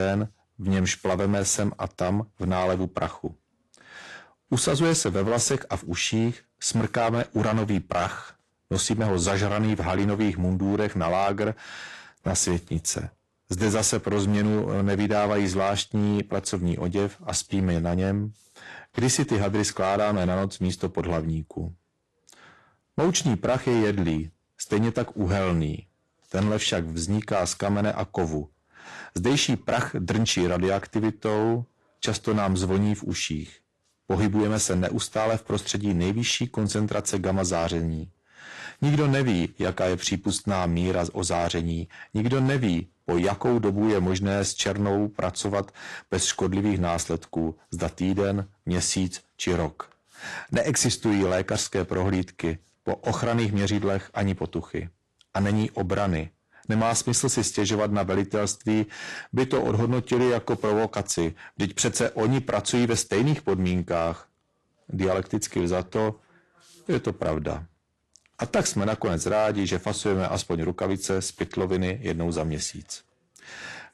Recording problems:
distortion; slight; 6% of the sound clipped
garbled, watery; slightly
abrupt cut into speech; at the start

